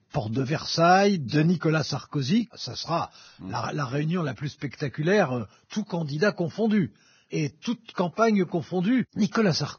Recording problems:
garbled, watery; badly; nothing above 6 kHz

